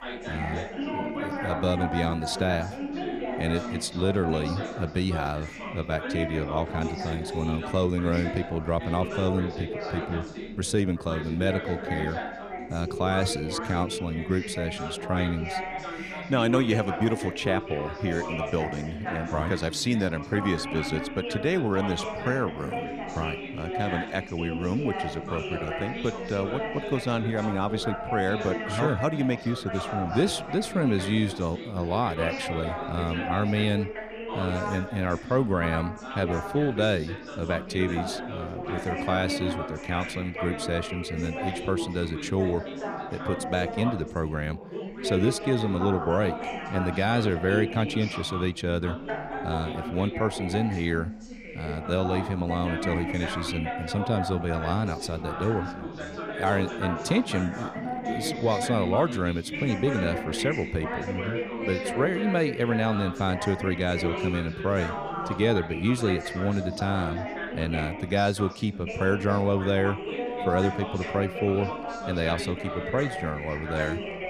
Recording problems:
background chatter; loud; throughout; 3 voices, 5 dB below the speech

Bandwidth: 15 kHz